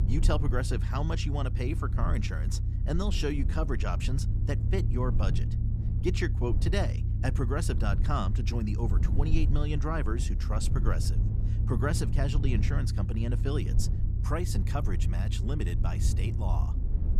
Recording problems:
low rumble; loud; throughout; 8 dB below the speech

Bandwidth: 14.5 kHz